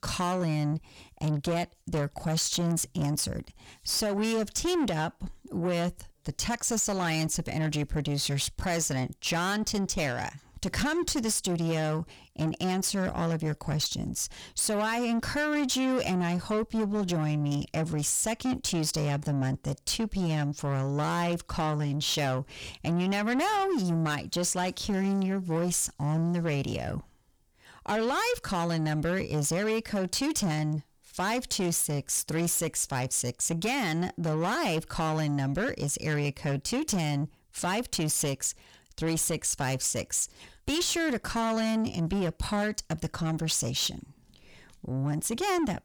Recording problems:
distortion; slight; 10 dB below the speech

